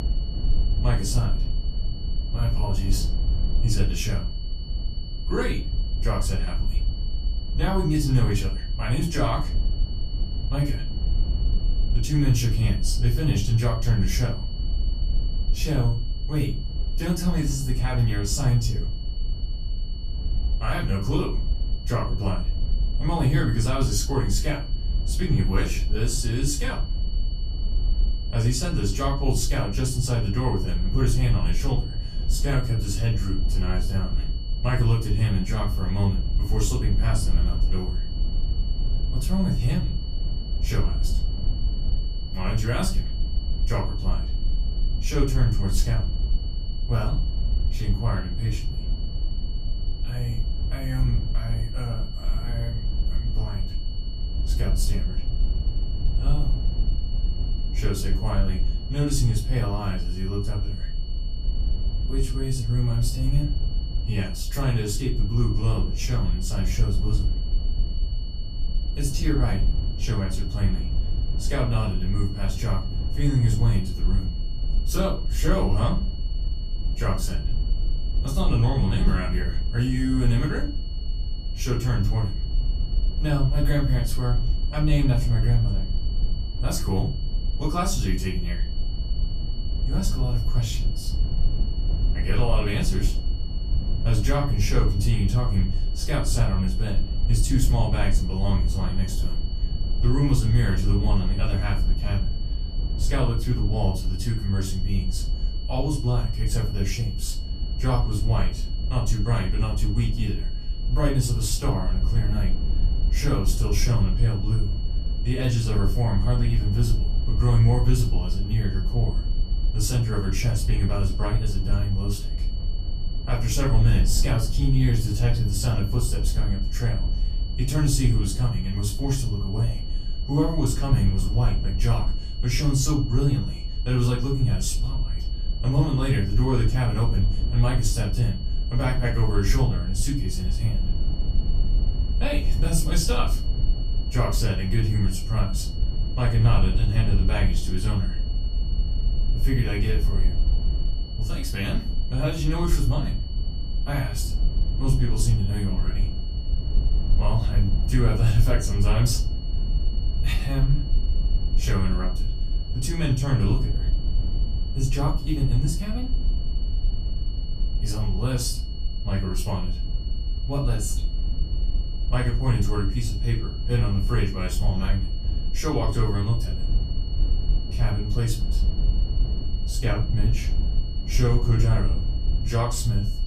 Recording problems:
off-mic speech; far
room echo; slight; dies away in 0.3 s
high-pitched whine; noticeable; throughout; 4.5 kHz, 15 dB below the speech
low rumble; noticeable; throughout; 15 dB below the speech

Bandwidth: 14.5 kHz